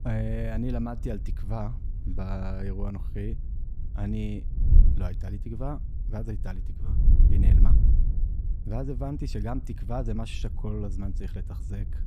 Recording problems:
wind noise on the microphone; heavy; 8 dB below the speech

